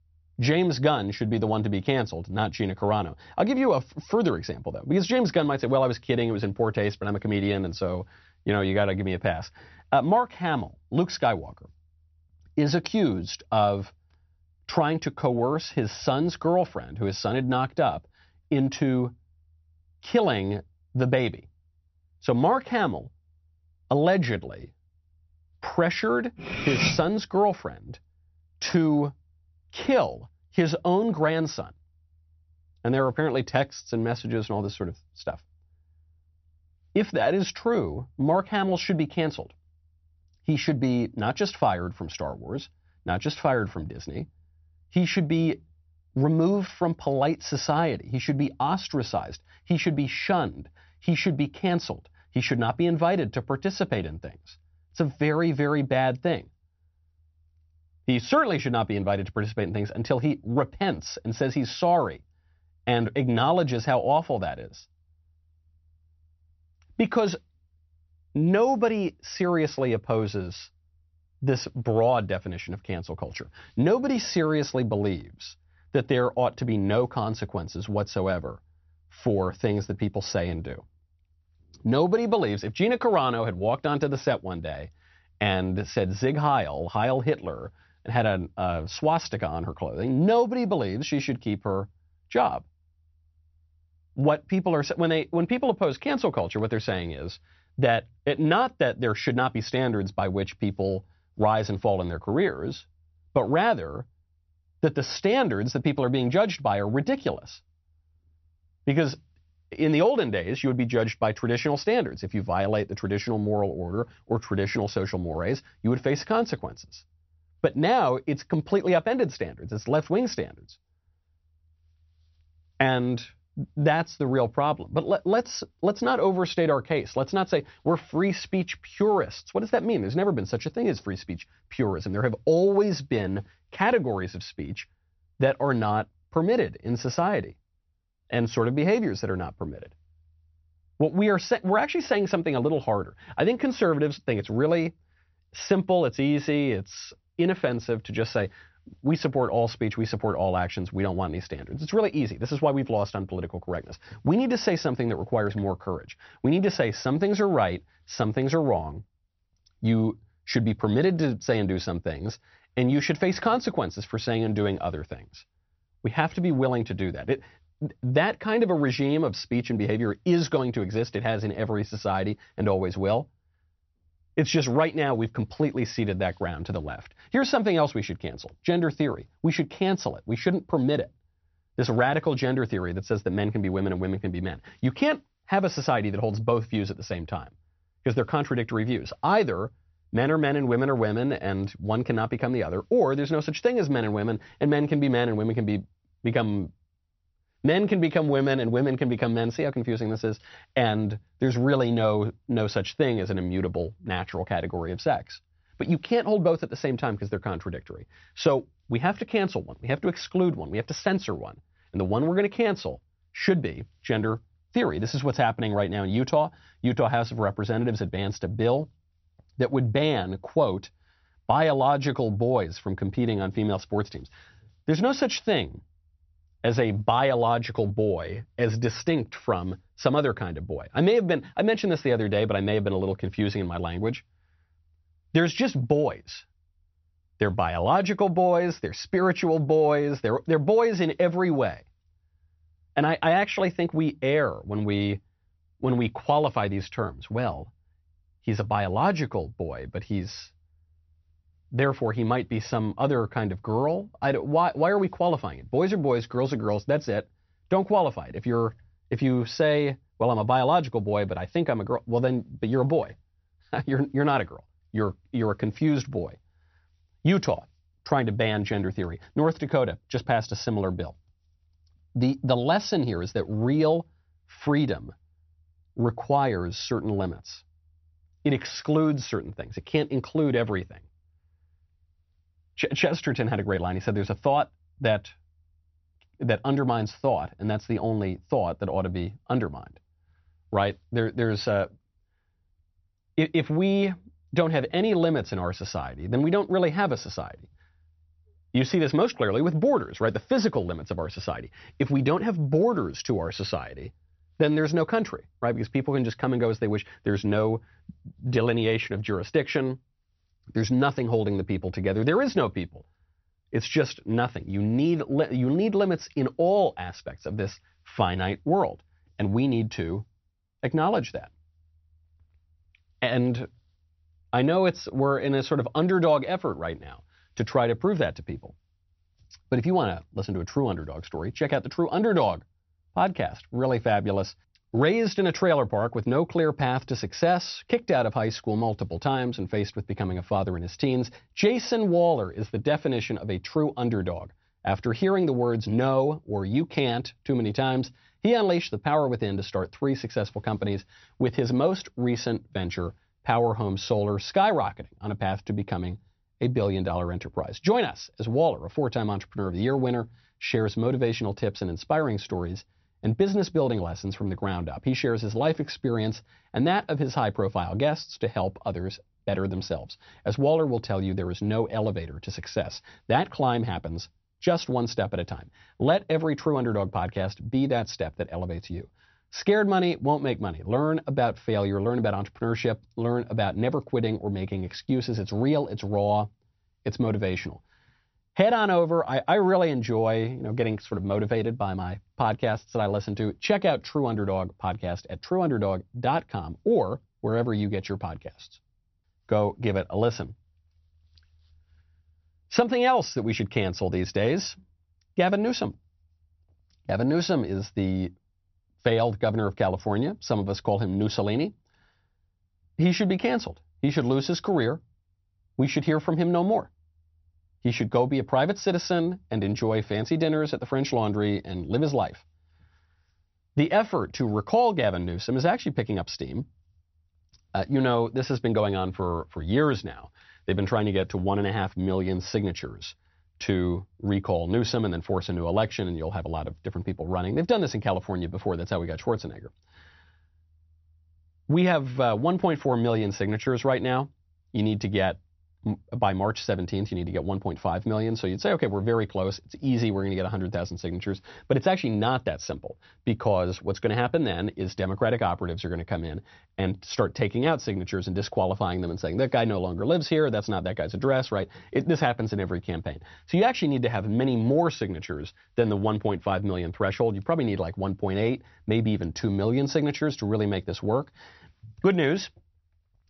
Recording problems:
high frequencies cut off; noticeable; nothing above 6 kHz
clattering dishes; loud; at 26 s; peak 2 dB above the speech

